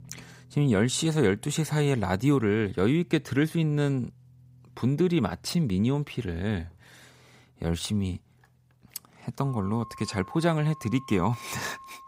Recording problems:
background music; faint; throughout; 20 dB below the speech

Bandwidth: 15.5 kHz